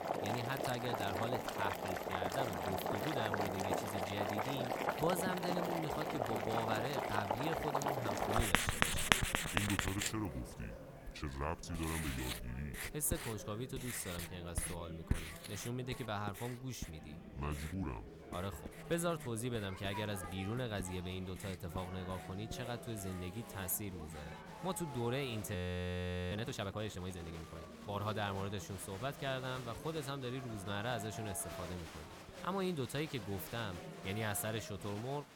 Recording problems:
household noises; very loud; throughout; 3 dB above the speech
murmuring crowd; noticeable; throughout; 10 dB below the speech
audio freezing; at 26 s for 1 s

